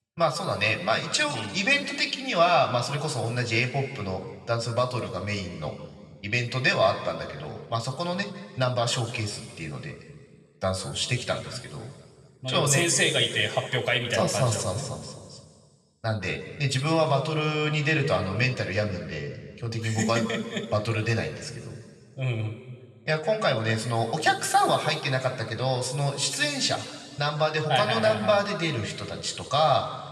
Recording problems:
room echo; noticeable; dies away in 1.7 s
off-mic speech; somewhat distant

